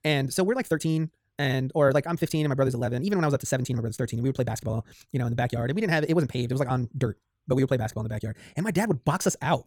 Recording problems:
wrong speed, natural pitch; too fast; 1.7 times normal speed

